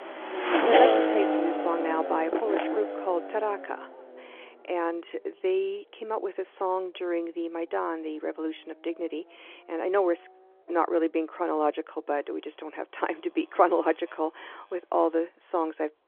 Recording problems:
phone-call audio; nothing above 3.5 kHz
traffic noise; very loud; throughout; 3 dB above the speech

